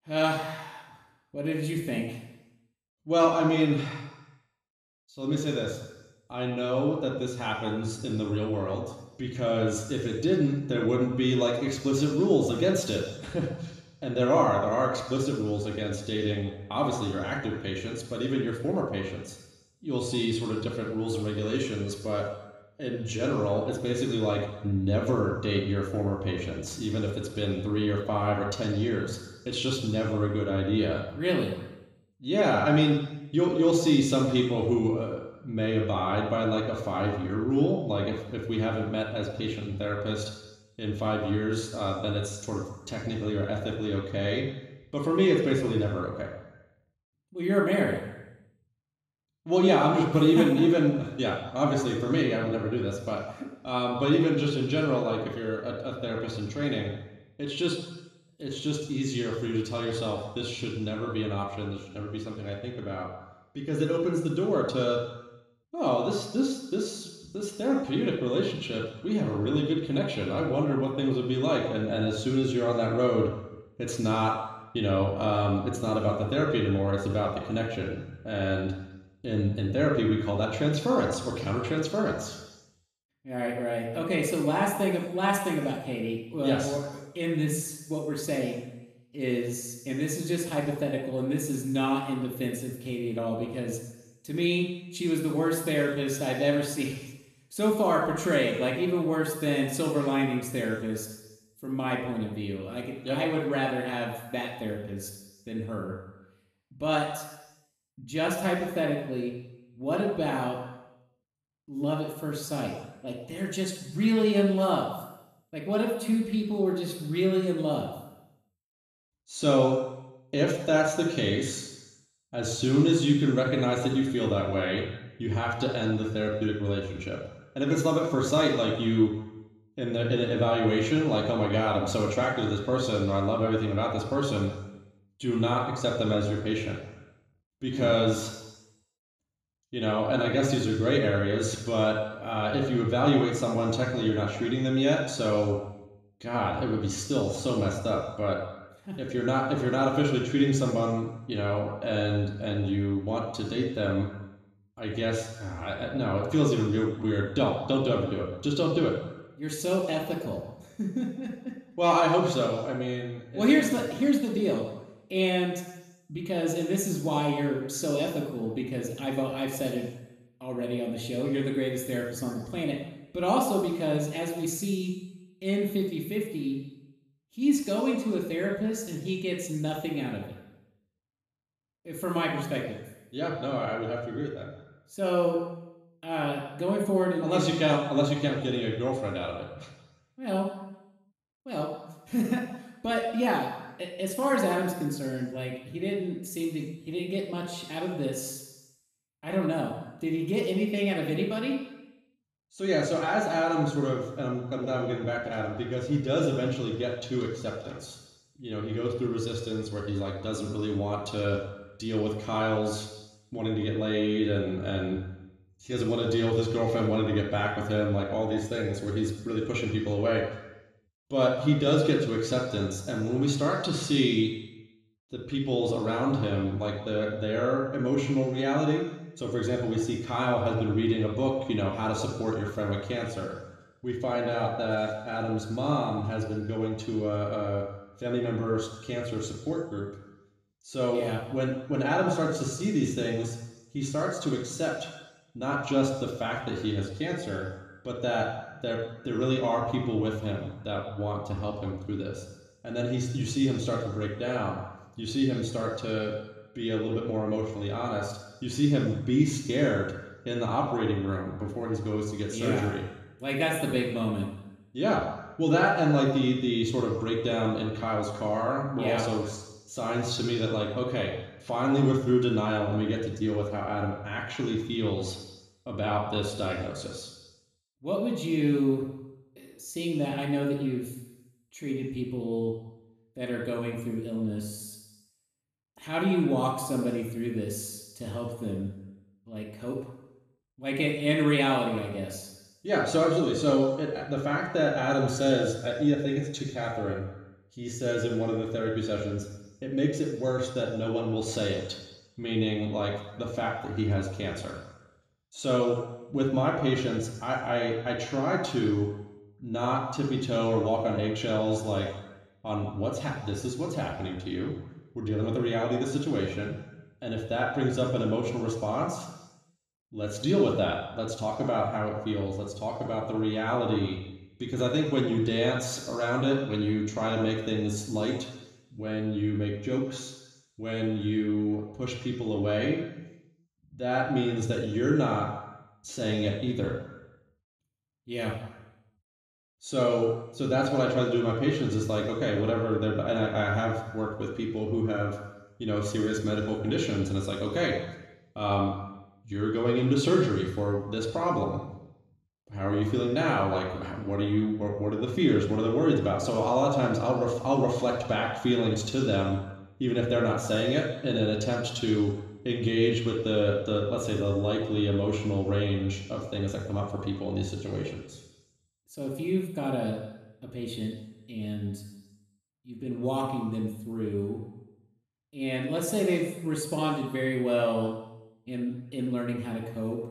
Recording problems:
room echo; noticeable; dies away in 1 s
off-mic speech; somewhat distant

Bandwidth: 14.5 kHz